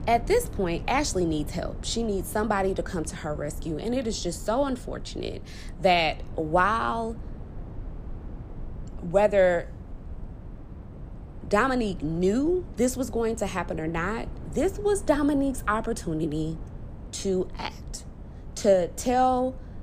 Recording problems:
low rumble; faint; throughout; 25 dB below the speech

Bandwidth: 15 kHz